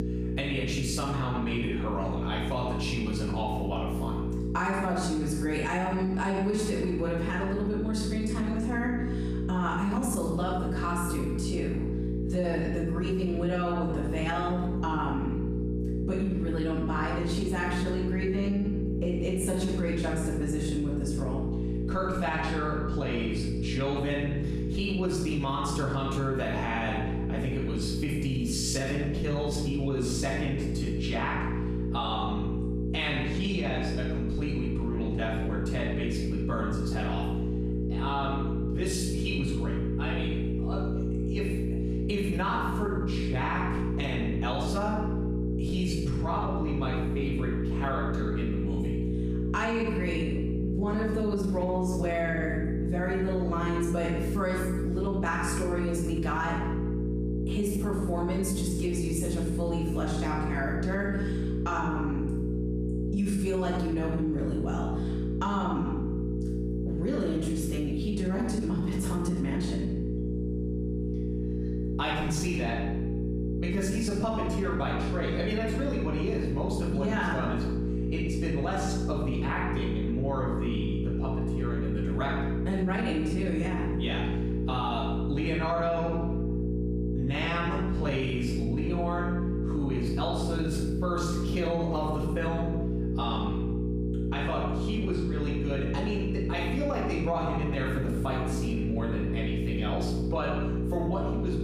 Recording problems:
off-mic speech; far
room echo; noticeable; dies away in 0.8 s
squashed, flat; somewhat
electrical hum; loud; throughout; 60 Hz, 6 dB below the speech

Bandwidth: 14.5 kHz